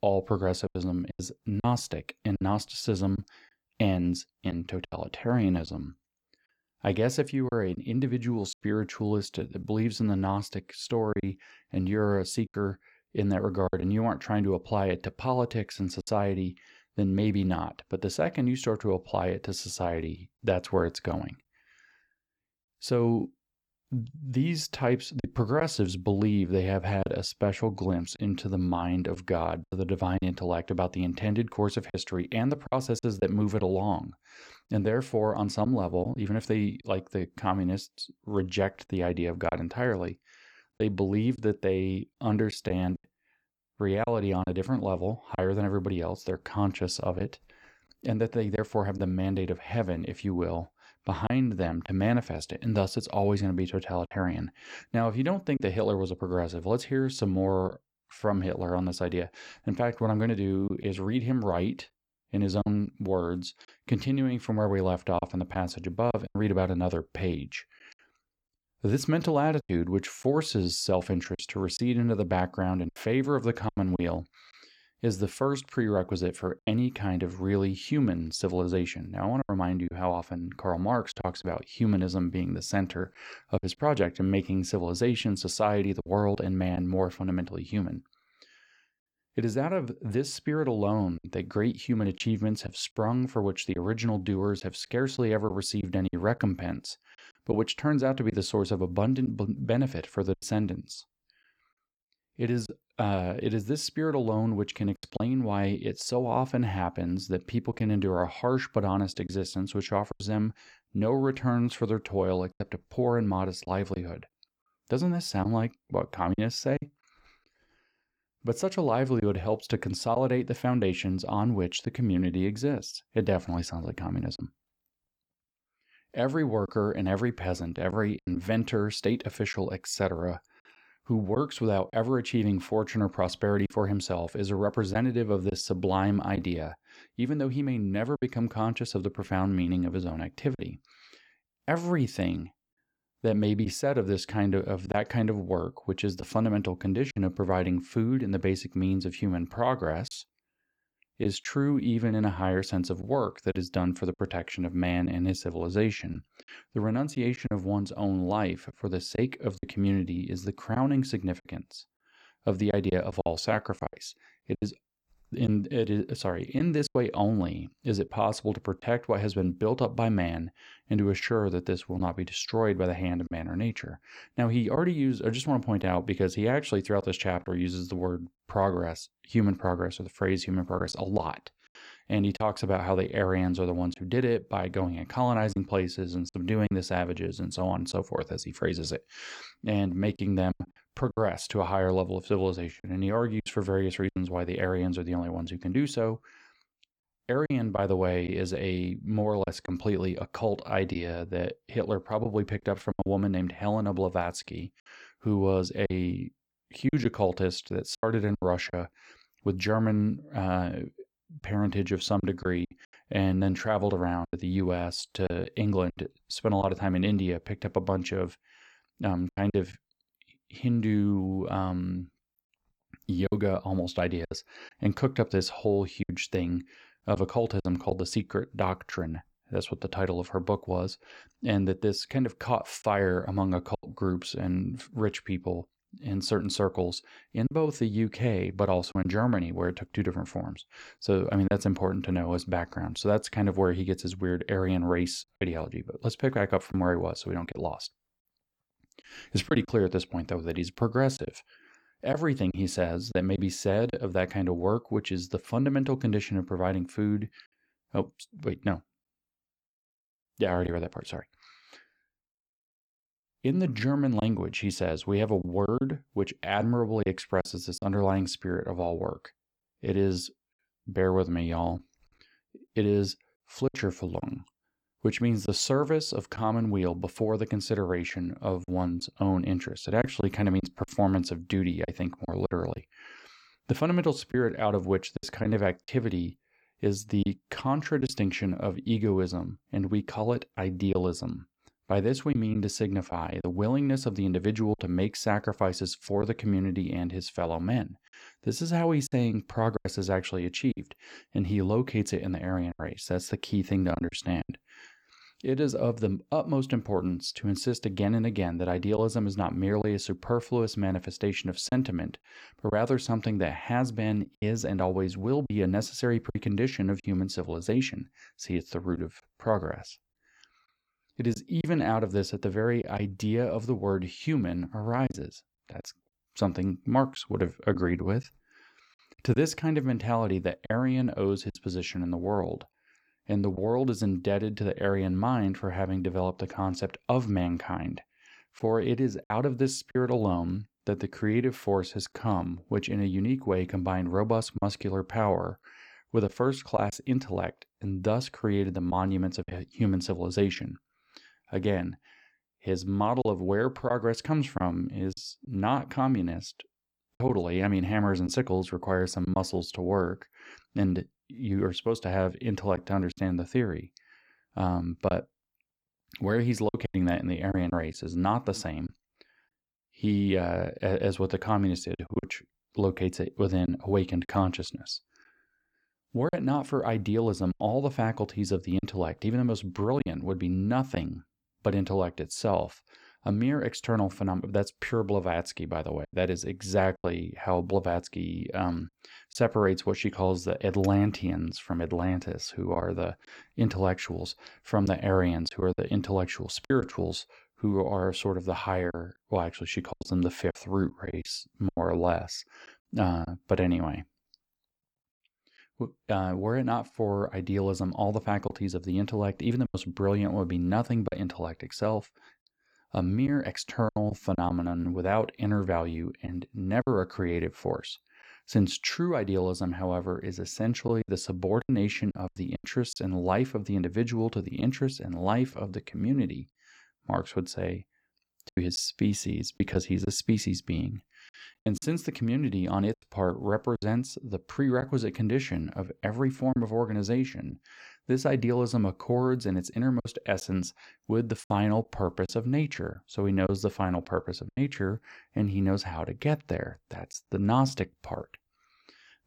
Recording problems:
choppy; occasionally; 3% of the speech affected

